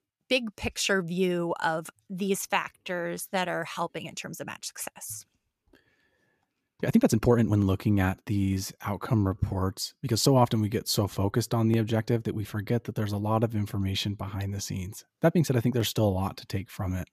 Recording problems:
uneven, jittery; strongly; from 2.5 to 16 s

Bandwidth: 14.5 kHz